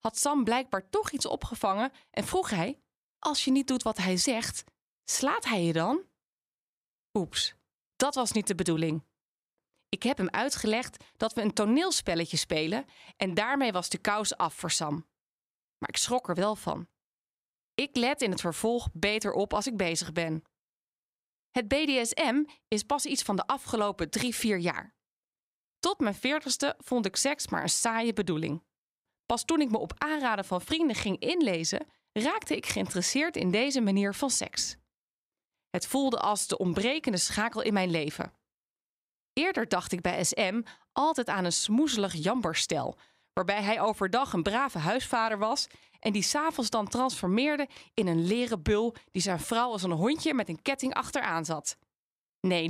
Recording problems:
abrupt cut into speech; at the end

